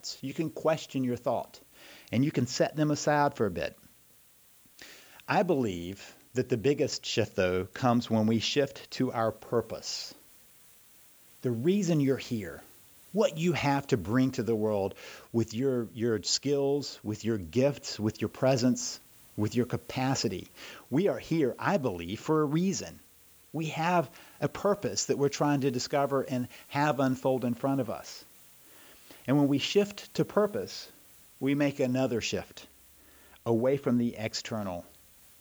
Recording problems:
high frequencies cut off; noticeable; nothing above 8 kHz
hiss; faint; throughout; 25 dB below the speech

